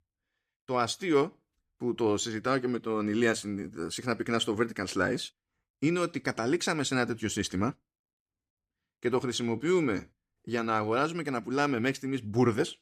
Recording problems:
none

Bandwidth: 14.5 kHz